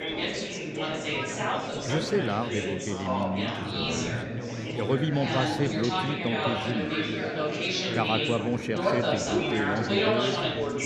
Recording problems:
chatter from many people; very loud; throughout; 2 dB above the speech

